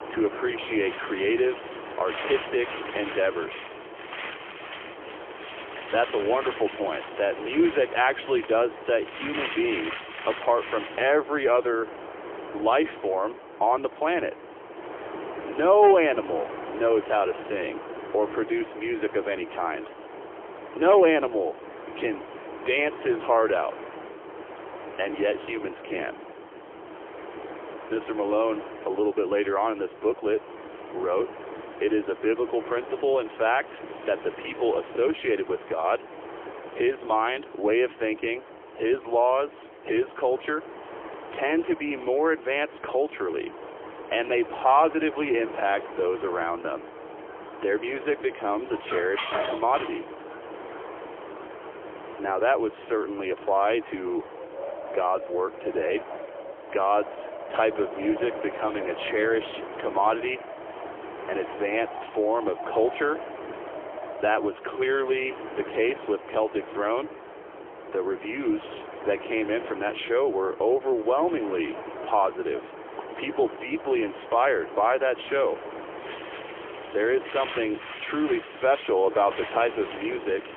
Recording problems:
phone-call audio; poor line; nothing above 3.5 kHz
wind in the background; noticeable; throughout; 10 dB below the speech
clattering dishes; noticeable; from 49 to 50 s; peak 2 dB below the speech

